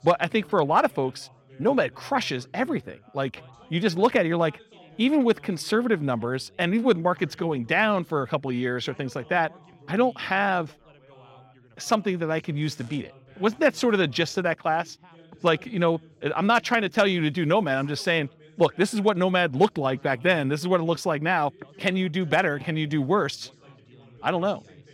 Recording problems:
background chatter; faint; throughout; 3 voices, 25 dB below the speech

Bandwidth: 16 kHz